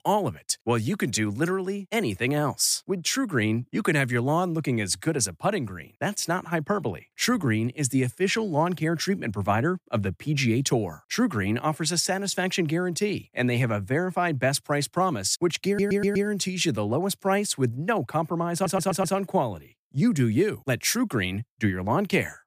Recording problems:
audio stuttering; at 16 s and at 19 s

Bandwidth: 15 kHz